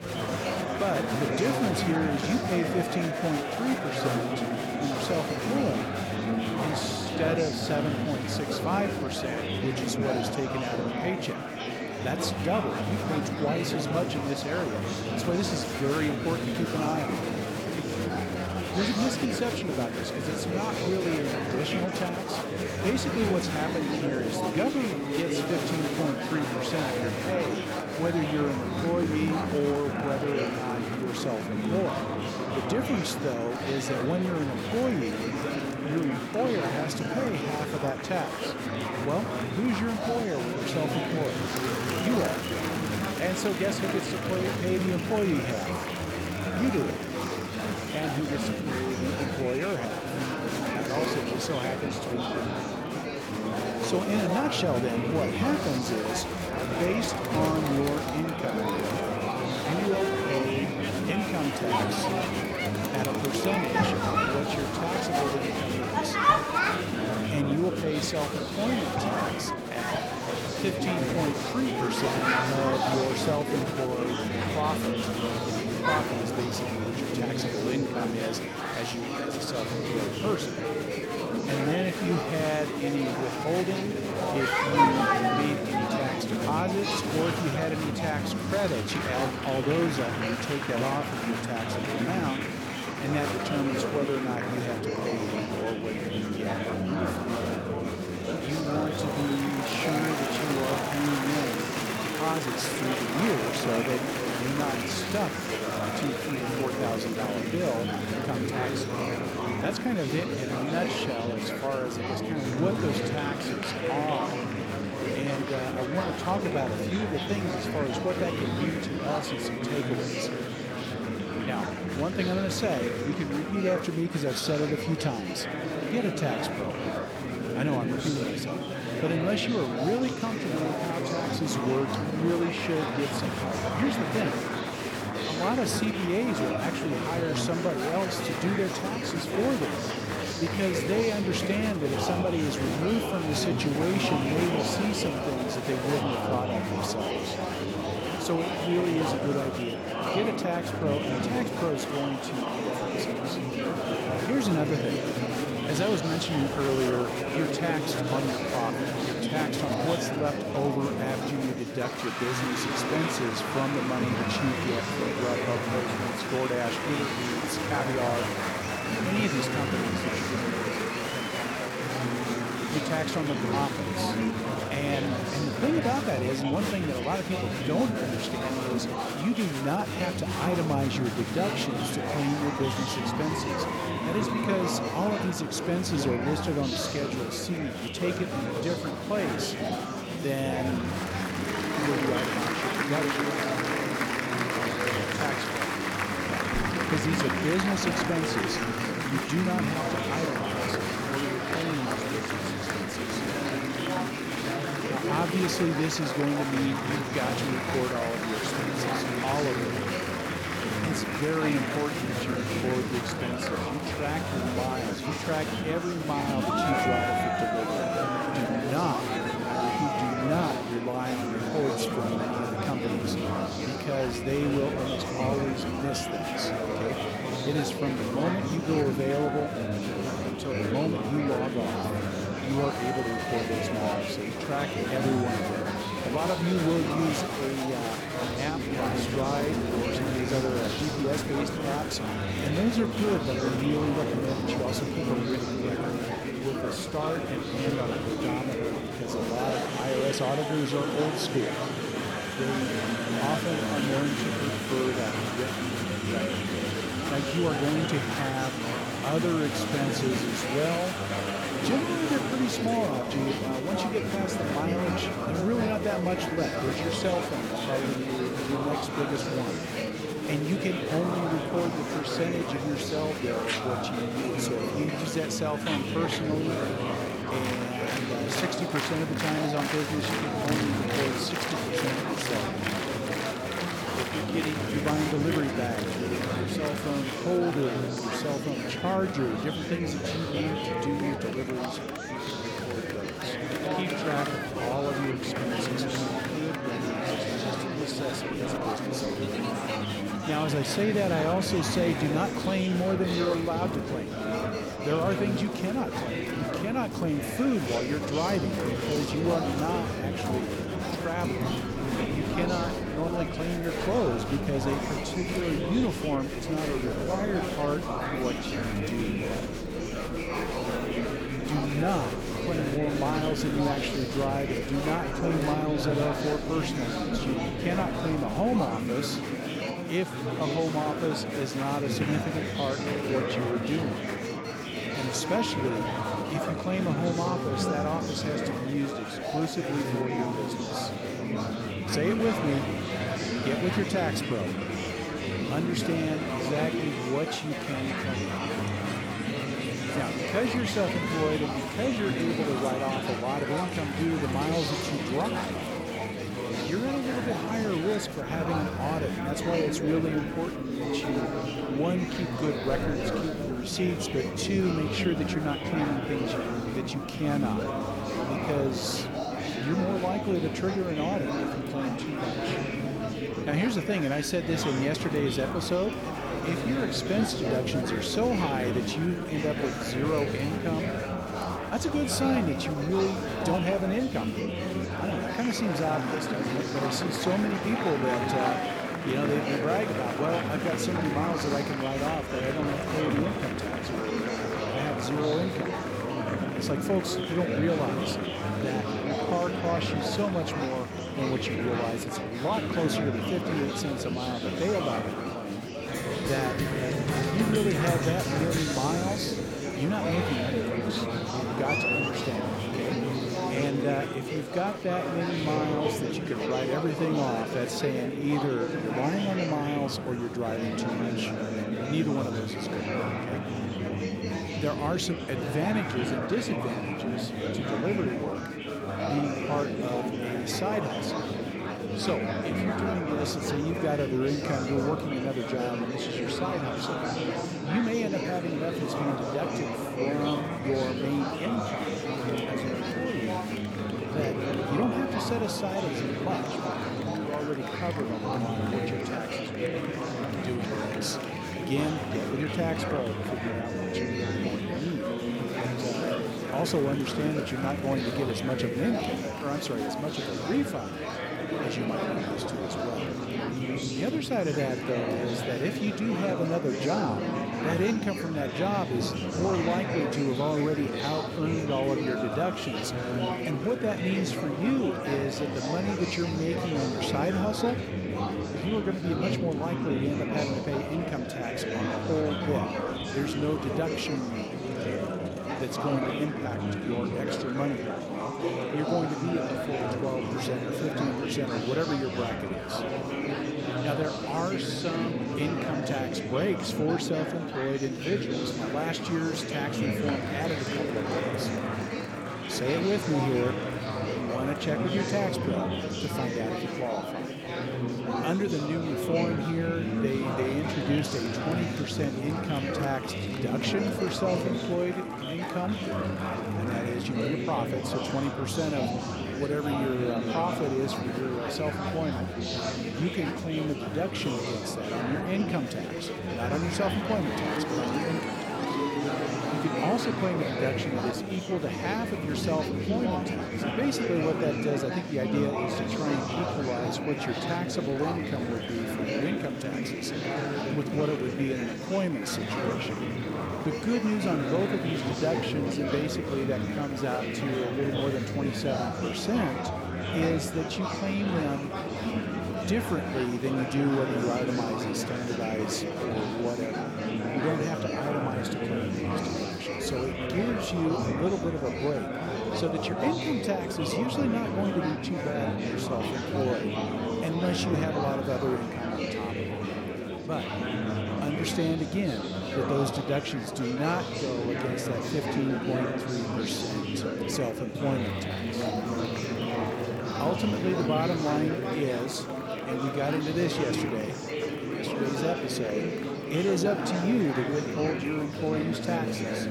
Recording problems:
murmuring crowd; very loud; throughout; 1 dB above the speech

